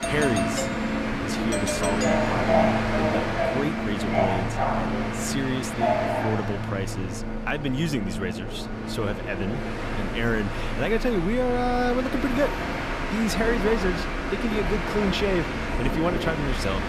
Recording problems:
train or aircraft noise; very loud; throughout; 1 dB above the speech
doorbell; noticeable; until 2.5 s; peak level with the speech

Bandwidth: 14.5 kHz